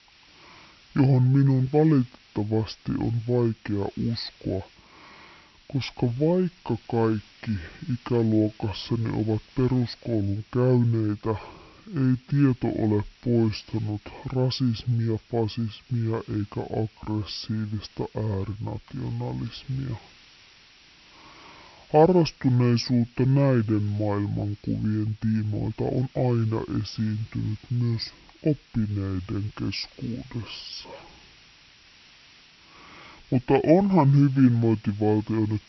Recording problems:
wrong speed and pitch; too slow and too low; 0.6 times normal speed
high frequencies cut off; noticeable; nothing above 5.5 kHz
hiss; faint; throughout; 25 dB below the speech
uneven, jittery; strongly; from 4.5 to 31 s

